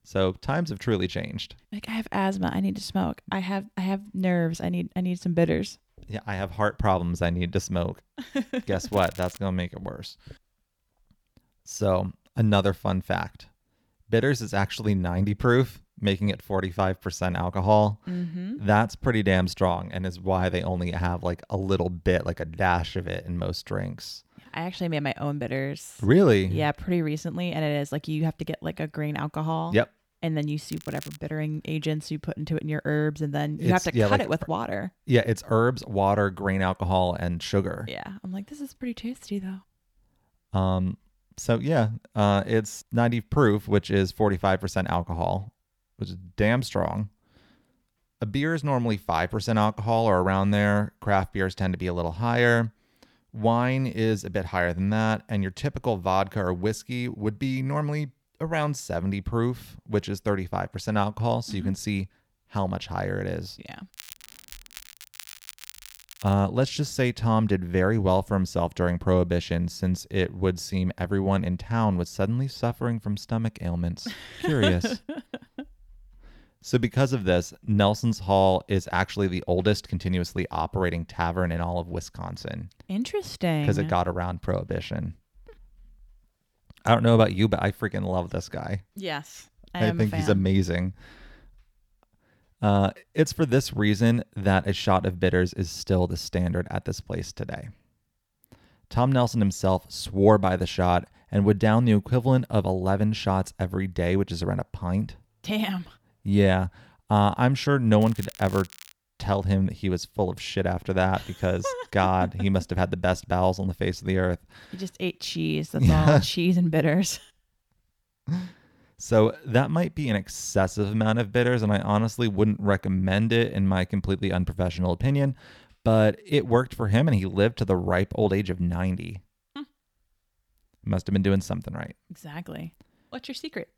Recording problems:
crackling; noticeable; 4 times, first at 9 s; 20 dB below the speech

